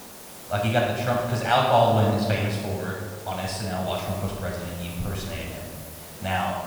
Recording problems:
off-mic speech; far
room echo; noticeable; dies away in 1.4 s
hiss; noticeable; throughout; 15 dB below the speech

